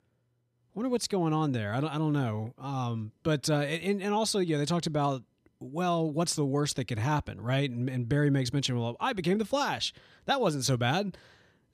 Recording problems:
none

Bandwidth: 14.5 kHz